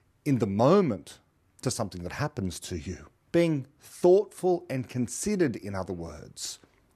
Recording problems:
none

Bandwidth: 13.5 kHz